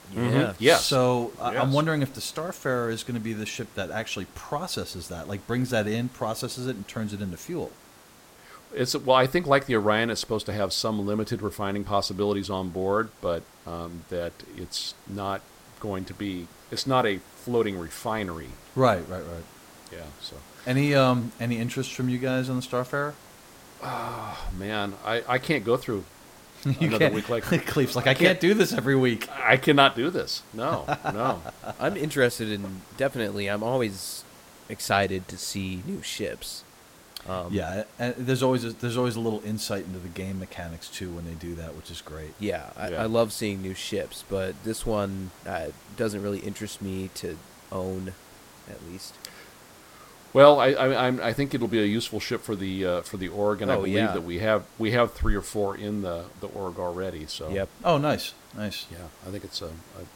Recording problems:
hiss; faint; throughout; 25 dB below the speech

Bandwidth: 16.5 kHz